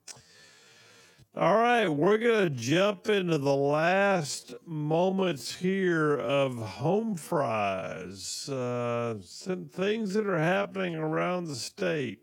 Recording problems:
wrong speed, natural pitch; too slow; 0.5 times normal speed

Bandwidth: 18 kHz